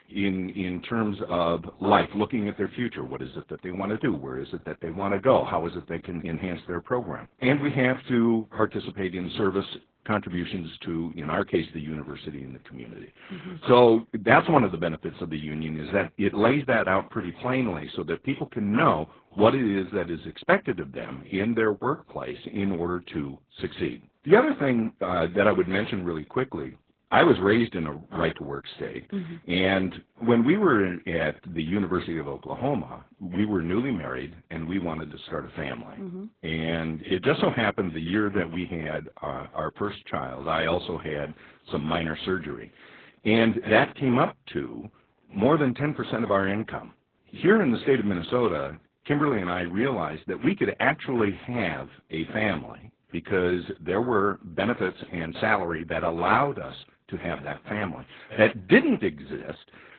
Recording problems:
garbled, watery; badly; nothing above 3.5 kHz

